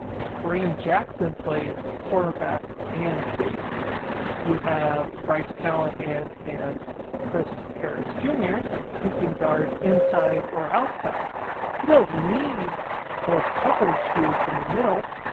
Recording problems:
garbled, watery; badly
muffled; very; fading above 4 kHz
train or aircraft noise; loud; throughout; 4 dB below the speech
background music; faint; throughout; 25 dB below the speech

